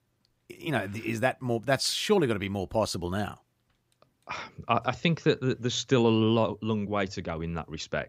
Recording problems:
none

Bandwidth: 15.5 kHz